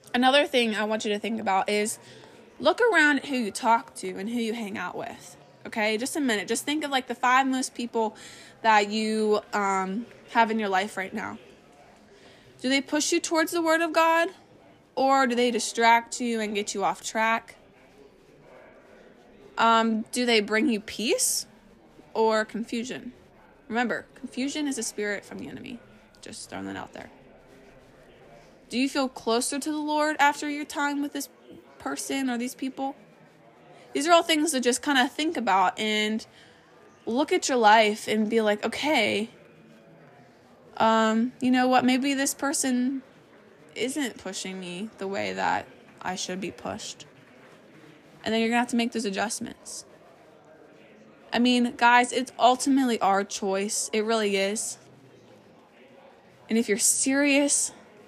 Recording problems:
murmuring crowd; faint; throughout; 30 dB below the speech

